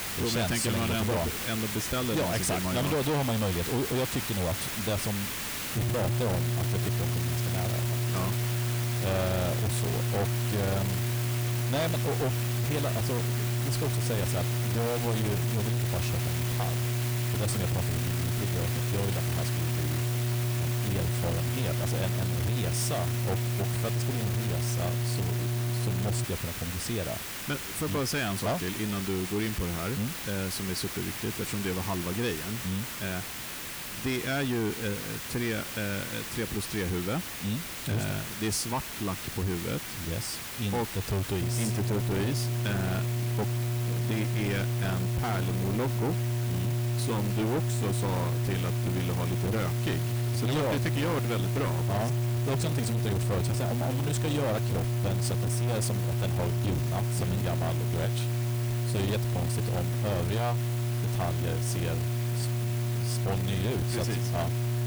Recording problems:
distortion; heavy; 8 dB below the speech
electrical hum; loud; from 6 to 26 s and from 41 s on; 60 Hz, 4 dB below the speech
hiss; loud; throughout; 3 dB below the speech

